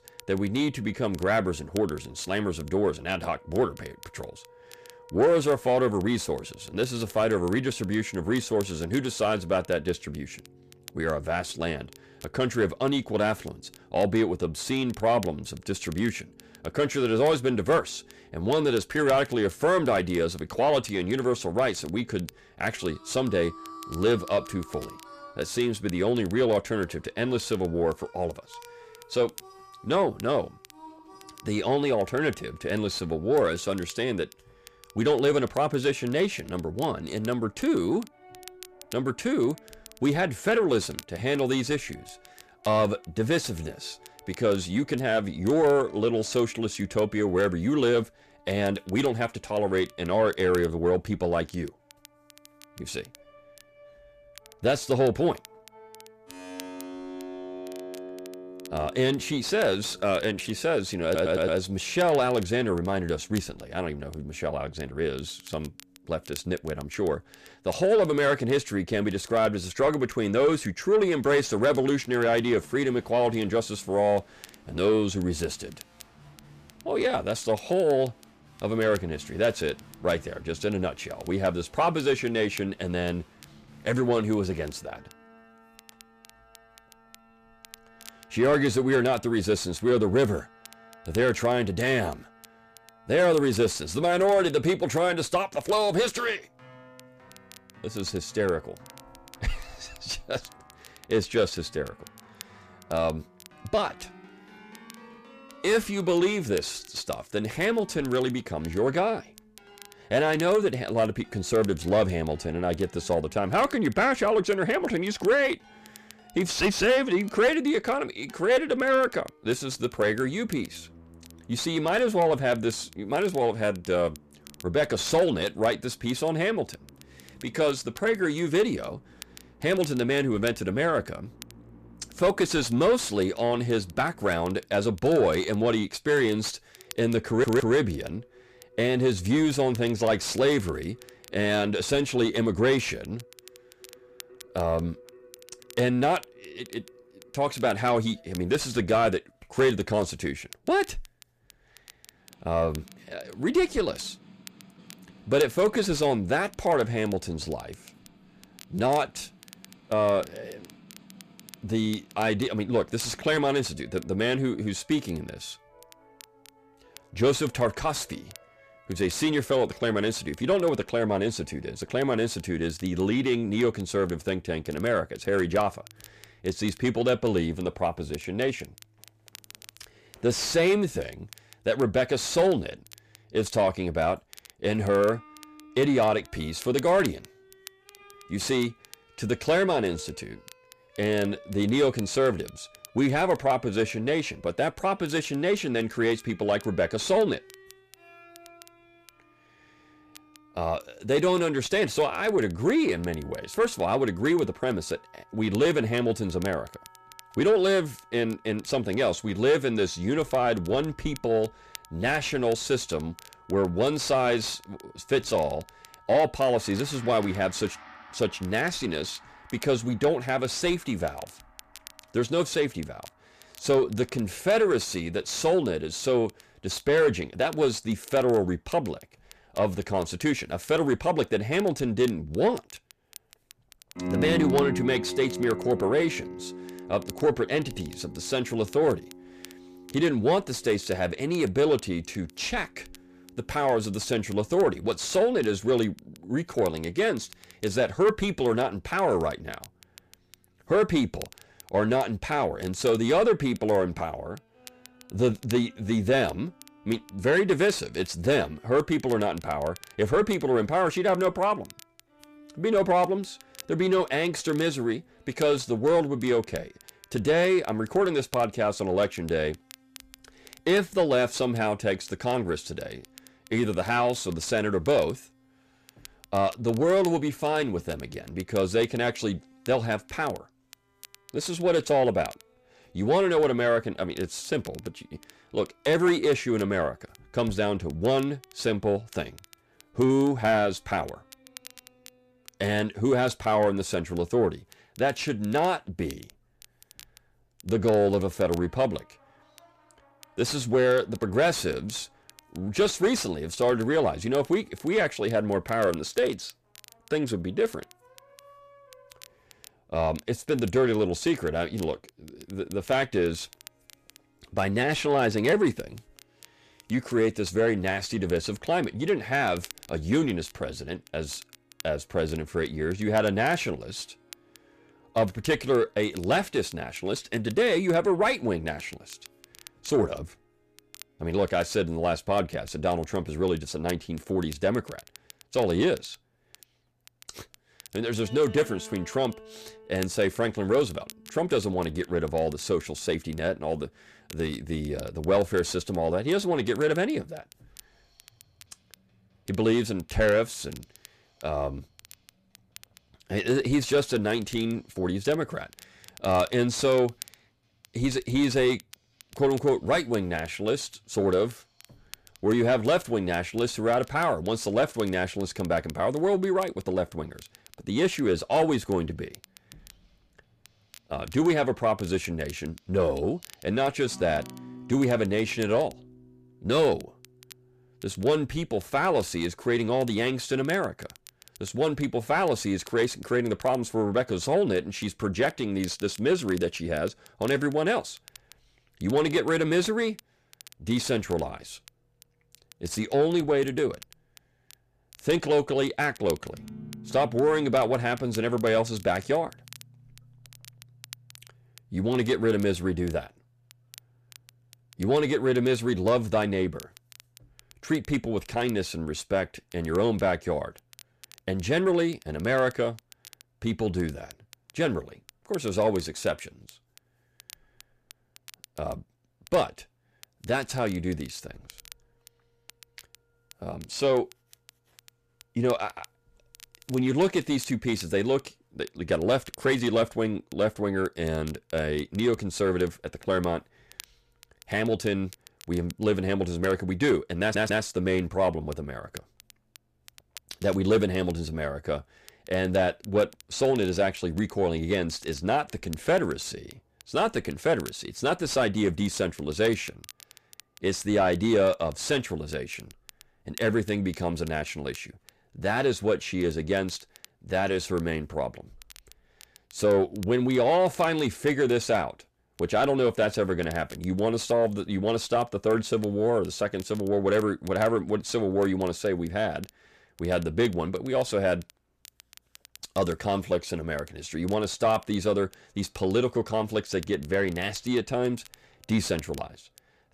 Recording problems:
distortion; slight; 10 dB below the speech
background music; faint; throughout; 20 dB below the speech
crackle, like an old record; faint; 25 dB below the speech
audio stuttering; at 1:01, at 2:17 and at 7:17

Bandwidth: 14.5 kHz